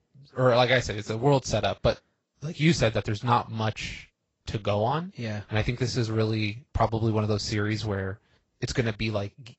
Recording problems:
garbled, watery; slightly; nothing above 7.5 kHz
high frequencies cut off; slight

